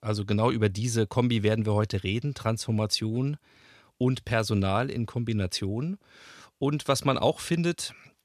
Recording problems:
none

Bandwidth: 14 kHz